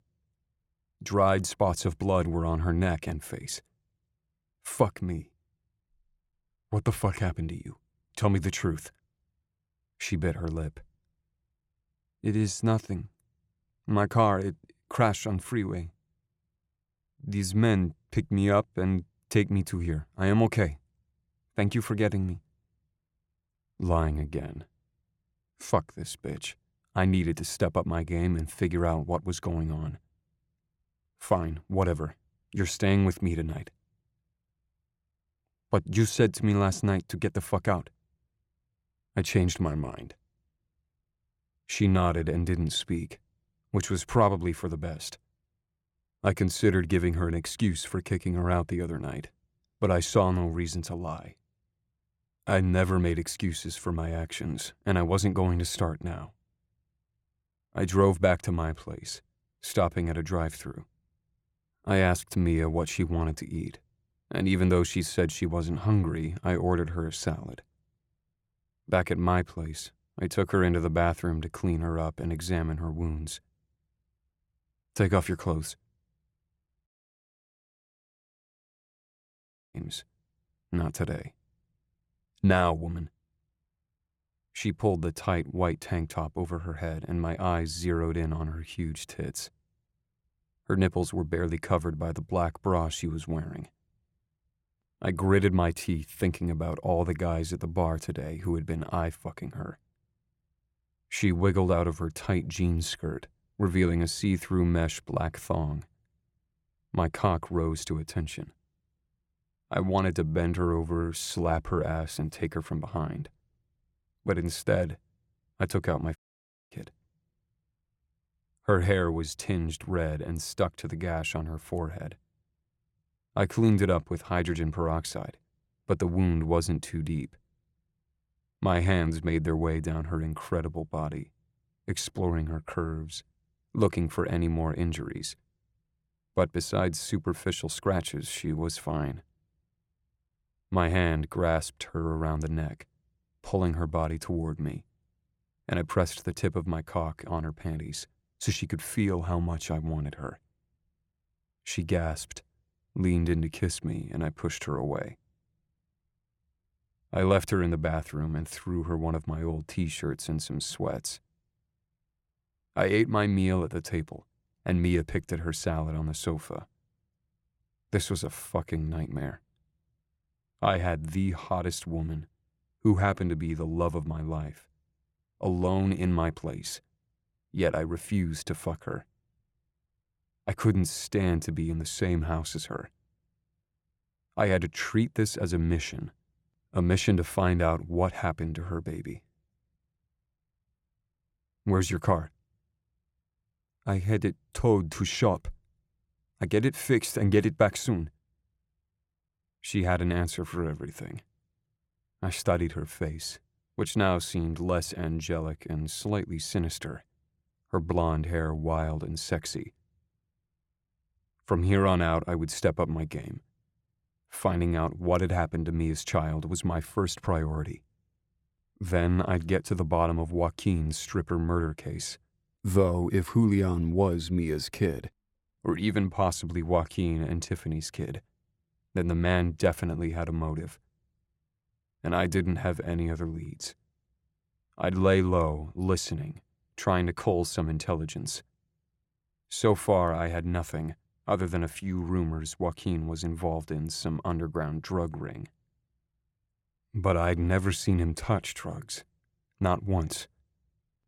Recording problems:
audio cutting out; at 1:17 for 3 s and at 1:56 for 0.5 s

